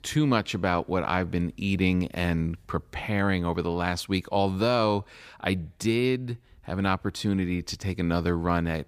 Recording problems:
none

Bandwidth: 15 kHz